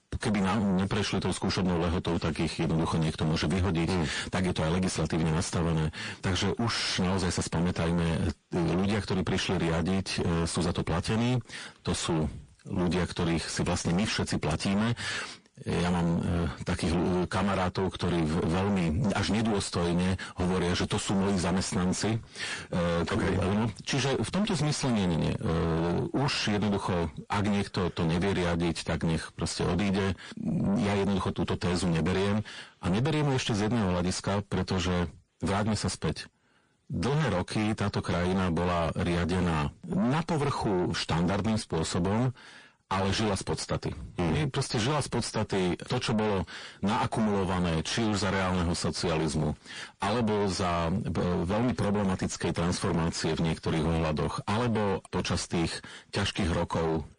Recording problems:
distortion; heavy; 6 dB below the speech
garbled, watery; slightly

